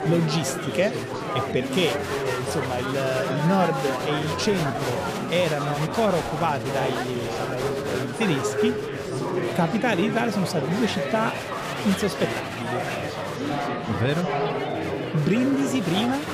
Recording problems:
chatter from many people; loud; throughout; 2 dB below the speech

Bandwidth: 15 kHz